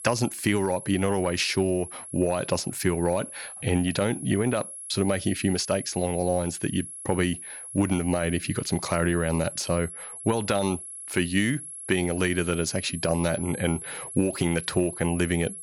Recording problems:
high-pitched whine; noticeable; throughout; 11 kHz, 10 dB below the speech

